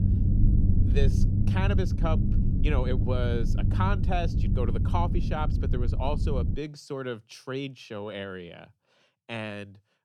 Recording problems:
low rumble; loud; until 6.5 s; 5 dB below the speech

